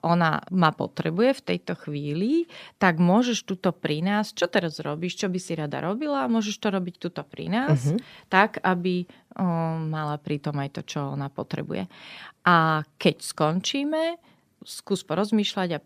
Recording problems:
none

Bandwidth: 15 kHz